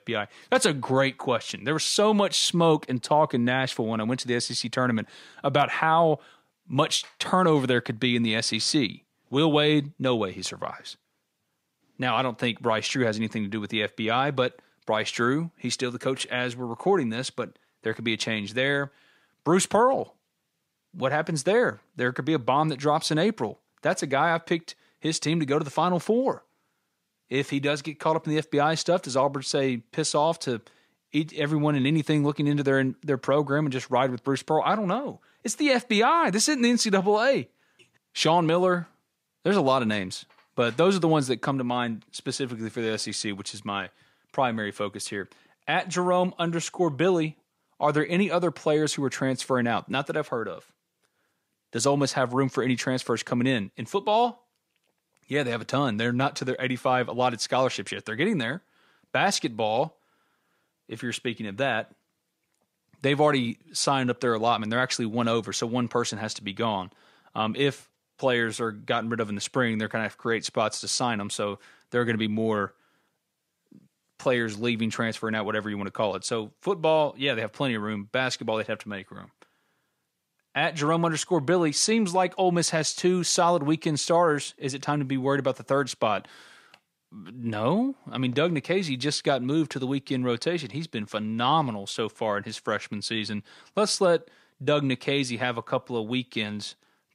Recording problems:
none

